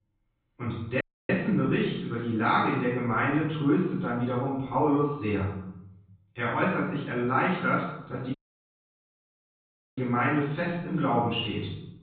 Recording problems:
off-mic speech; far
high frequencies cut off; severe; nothing above 4 kHz
room echo; noticeable; dies away in 0.9 s
audio cutting out; at 1 s and at 8.5 s for 1.5 s

